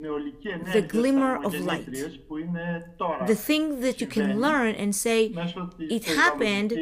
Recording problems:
voice in the background; loud; throughout; 8 dB below the speech

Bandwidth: 15 kHz